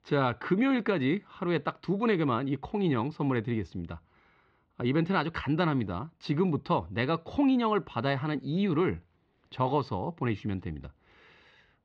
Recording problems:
muffled; very slightly; fading above 4 kHz

